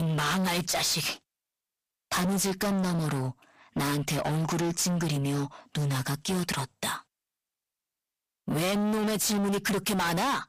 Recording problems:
distortion; heavy; 31% of the sound clipped
abrupt cut into speech; at the start

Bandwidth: 15 kHz